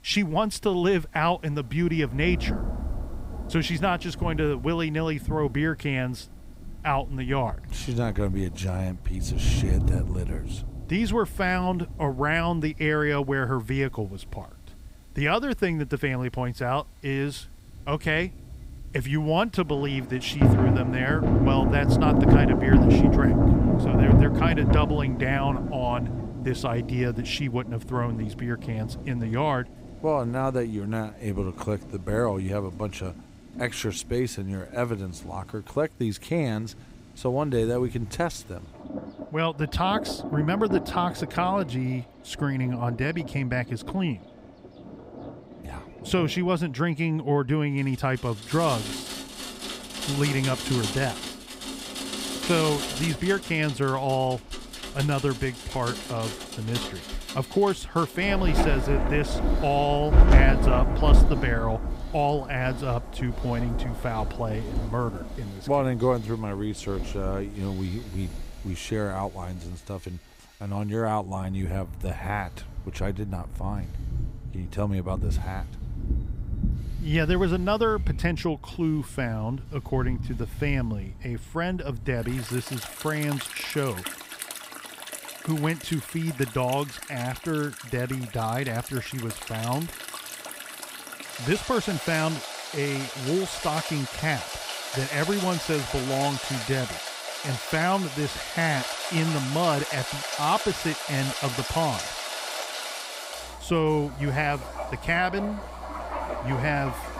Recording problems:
rain or running water; loud; throughout; 1 dB below the speech
machinery noise; faint; throughout; 25 dB below the speech

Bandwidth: 15.5 kHz